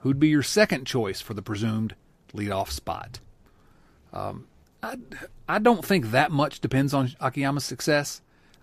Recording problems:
none

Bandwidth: 14.5 kHz